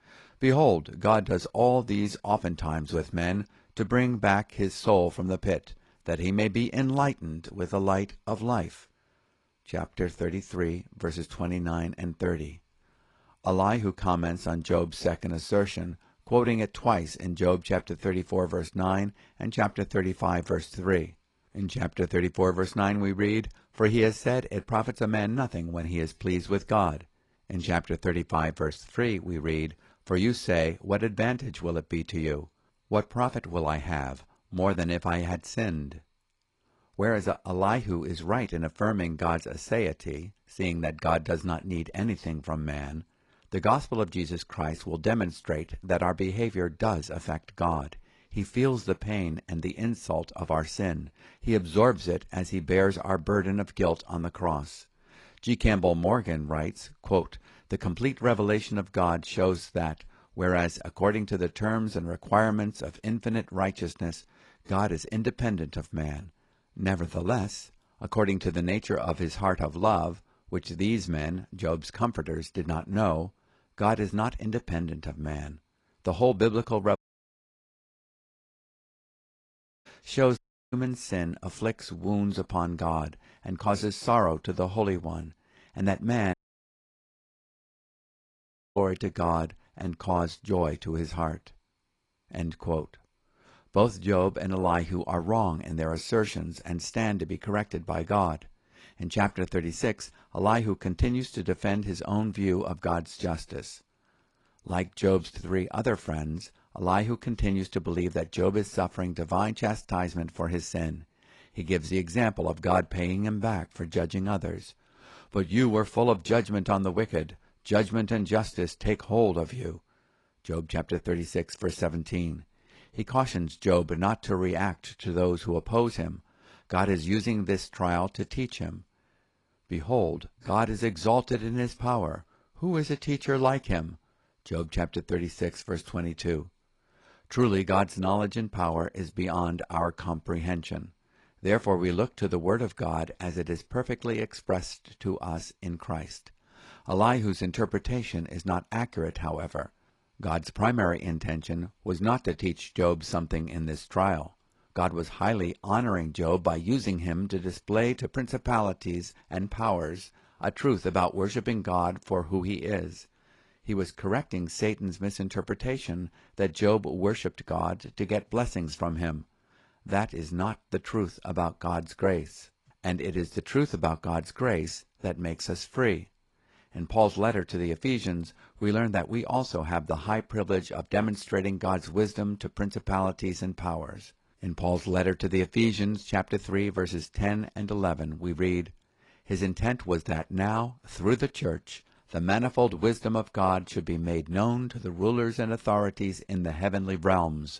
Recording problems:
garbled, watery; slightly; nothing above 10.5 kHz
audio cutting out; at 1:17 for 3 s, at 1:20 and at 1:26 for 2.5 s

